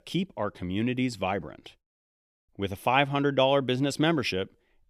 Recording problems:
none

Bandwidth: 14.5 kHz